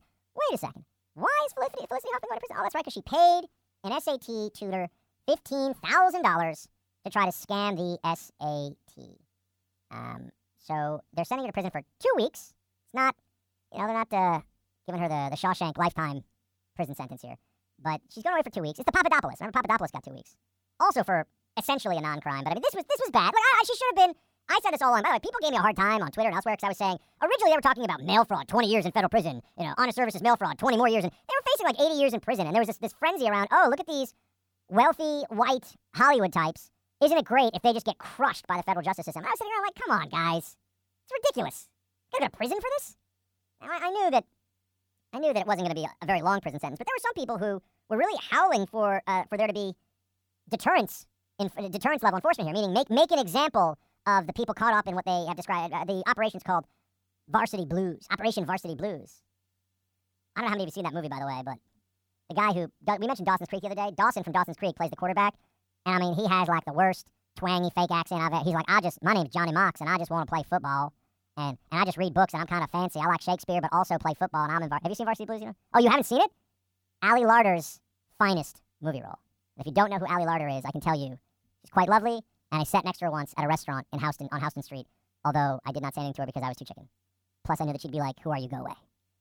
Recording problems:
wrong speed and pitch; too fast and too high; 1.5 times normal speed

